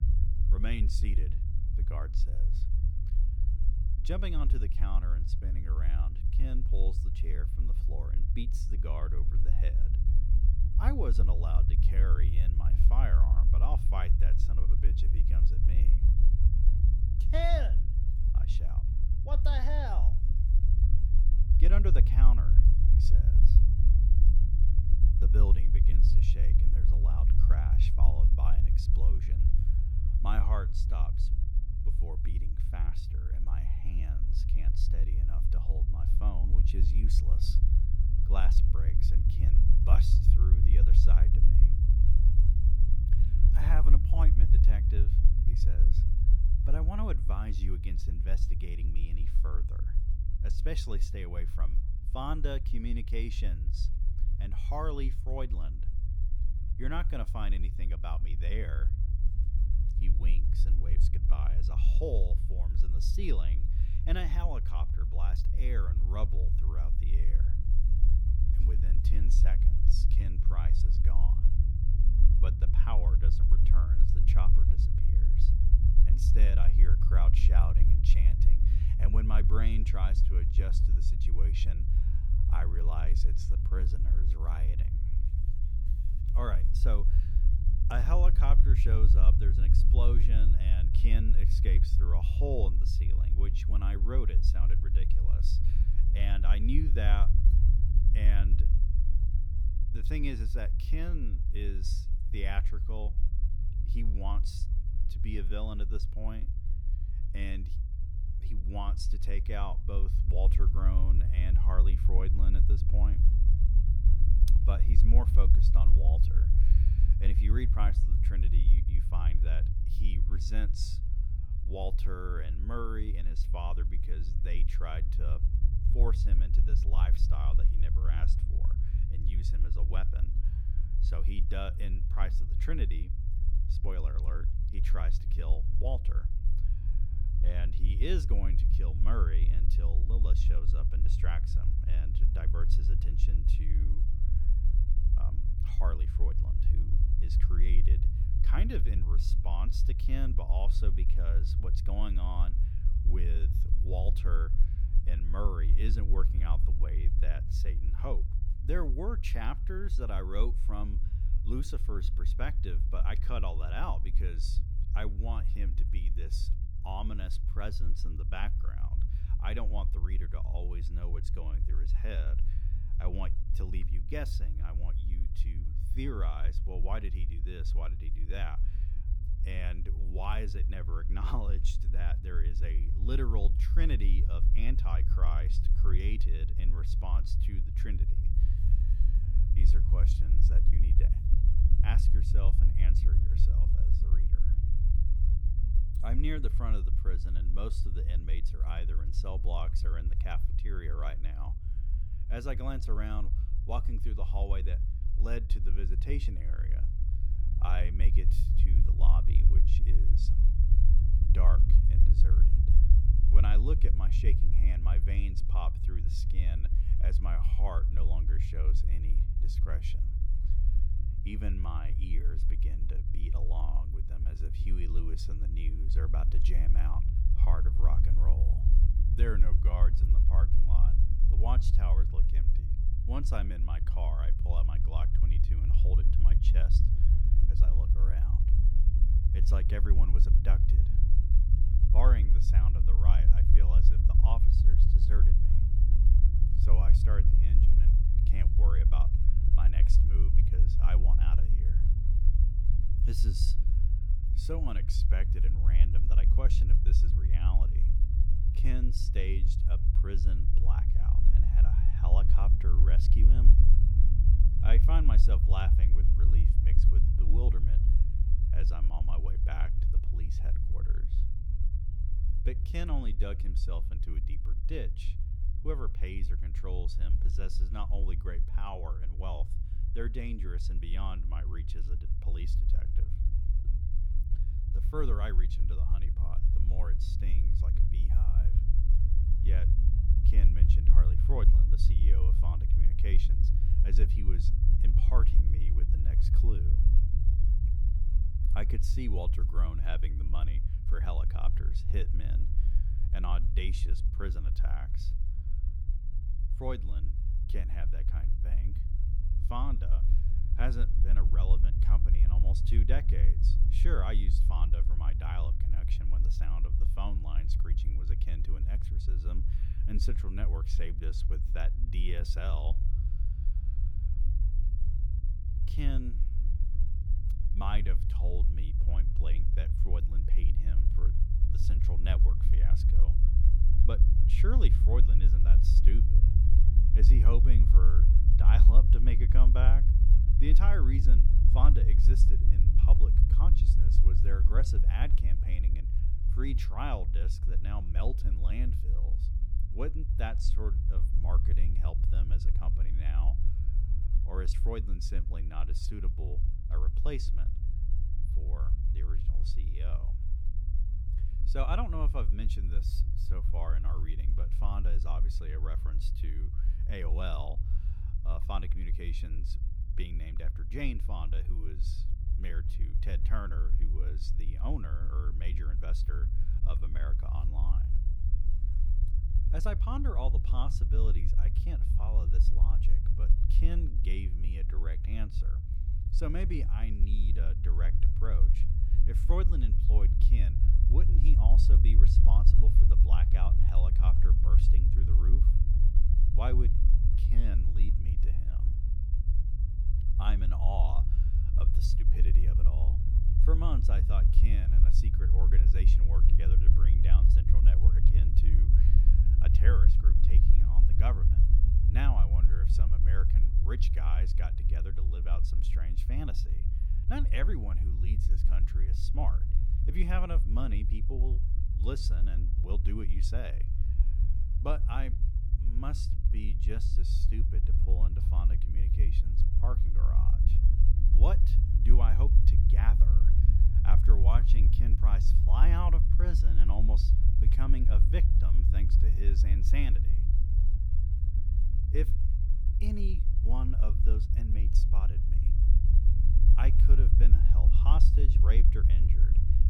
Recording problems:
low rumble; loud; throughout; 5 dB below the speech

